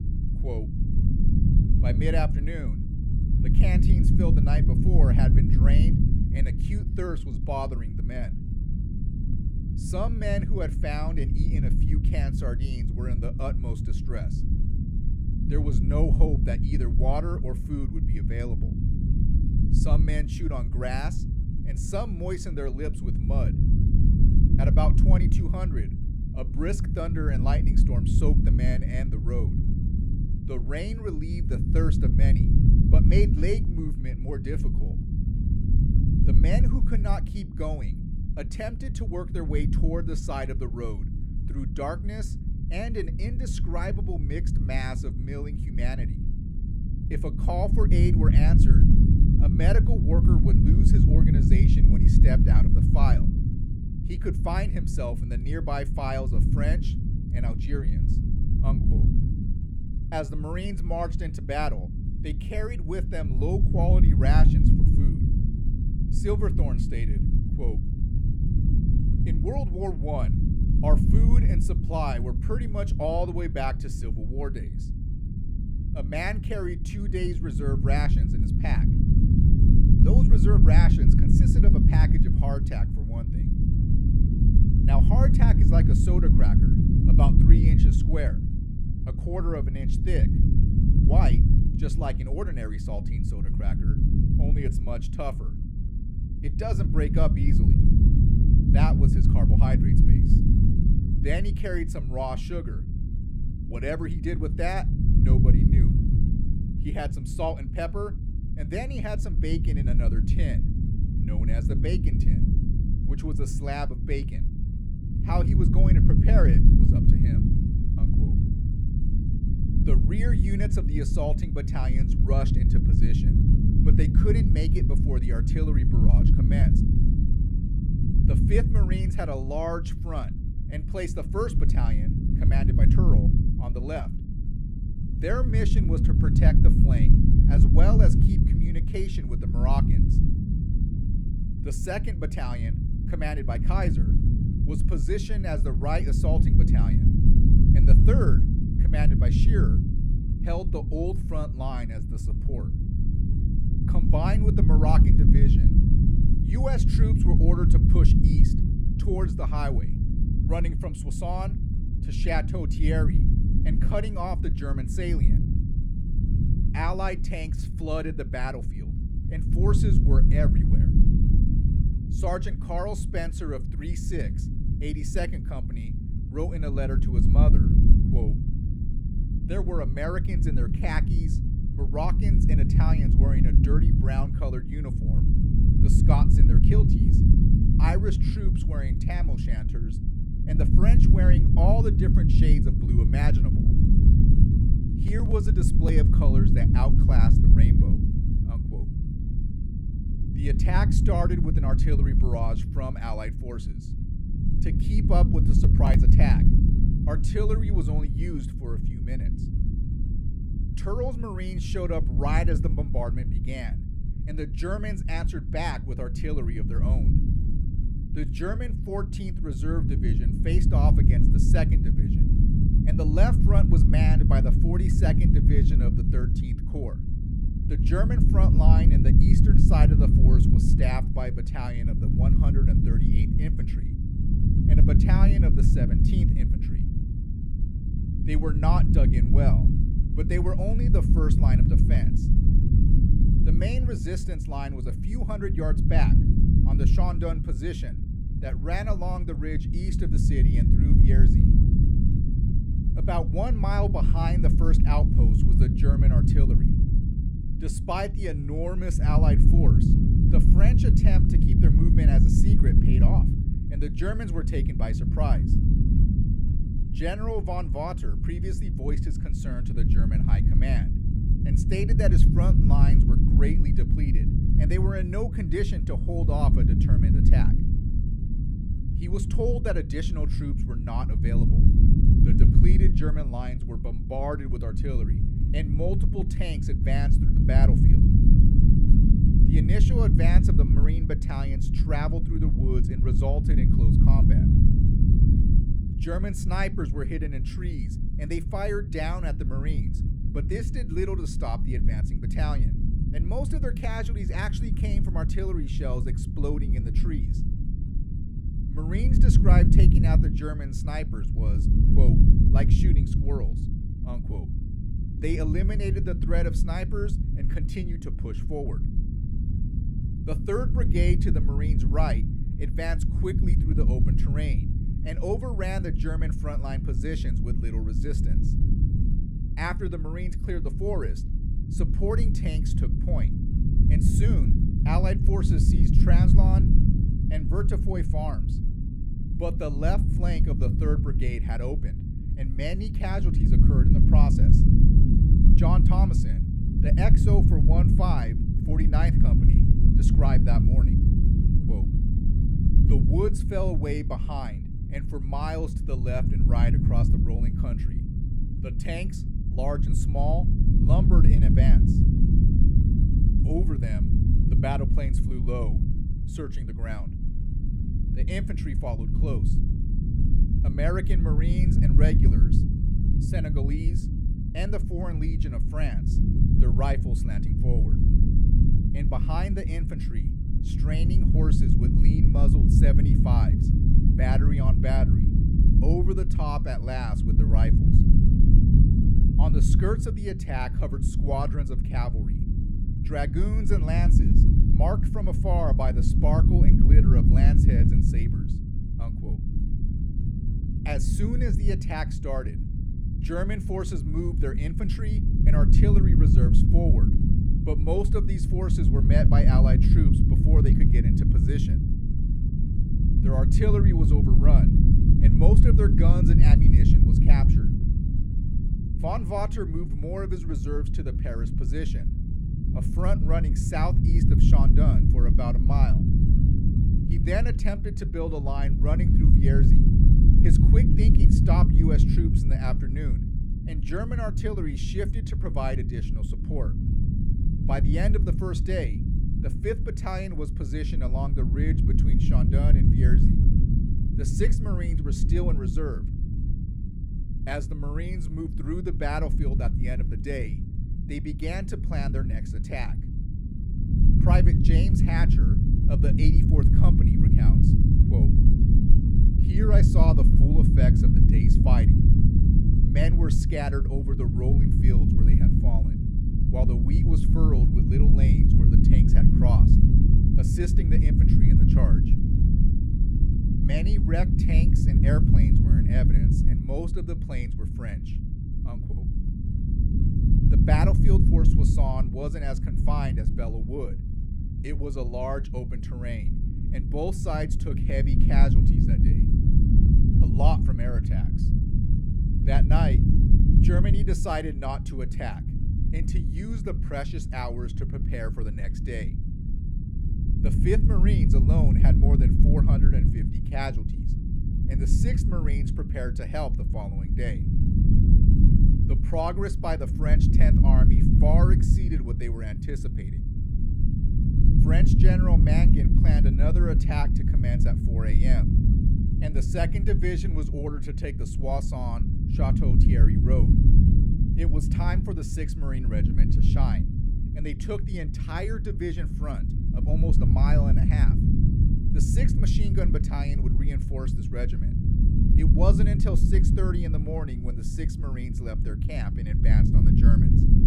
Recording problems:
low rumble; loud; throughout; 2 dB below the speech

